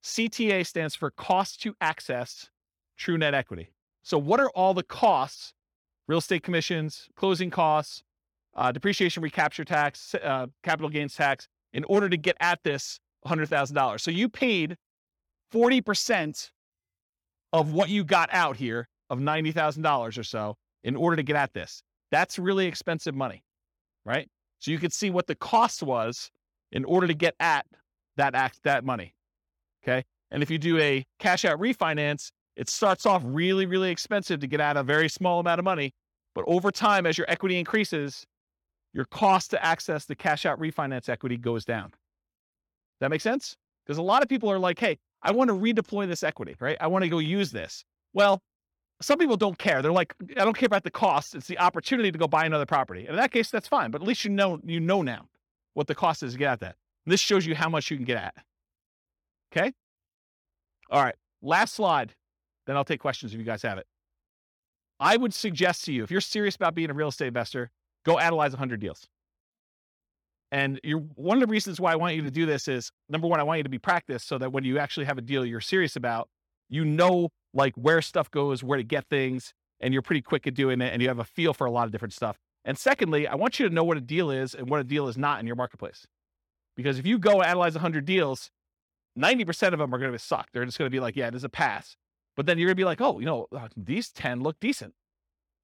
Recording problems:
none

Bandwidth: 17 kHz